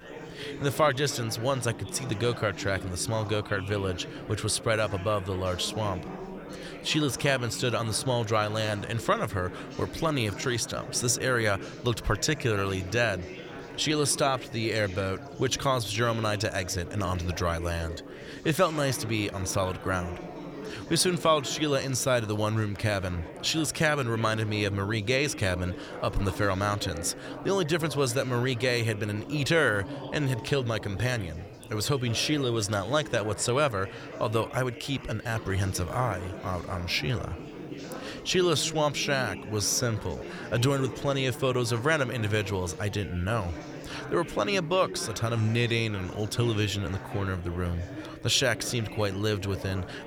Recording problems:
chatter from many people; noticeable; throughout; 10 dB below the speech

